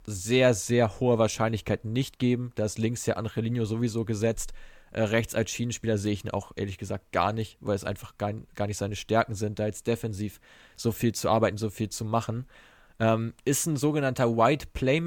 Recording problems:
abrupt cut into speech; at the end

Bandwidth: 18 kHz